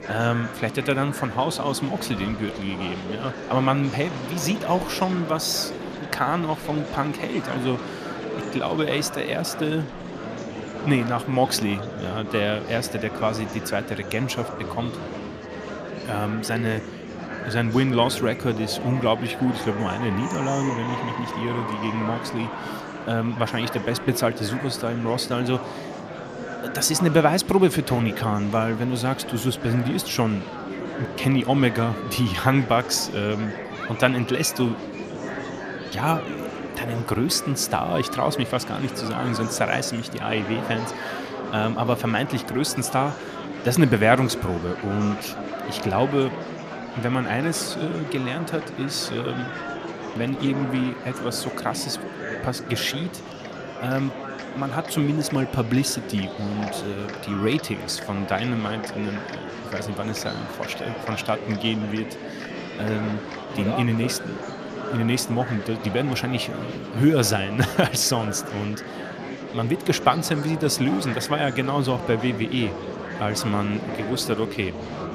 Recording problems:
murmuring crowd; loud; throughout; 8 dB below the speech

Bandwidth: 14.5 kHz